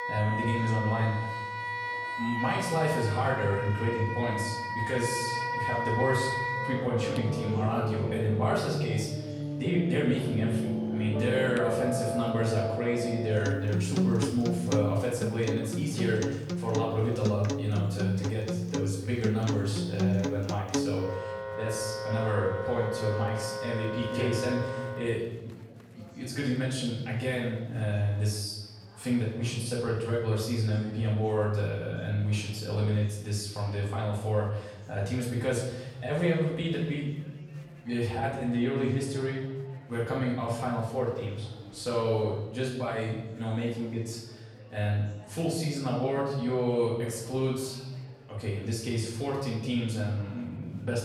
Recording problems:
off-mic speech; far
room echo; noticeable; dies away in 1 s
background music; loud; until 25 s; 3 dB below the speech
chatter from many people; faint; throughout; 25 dB below the speech

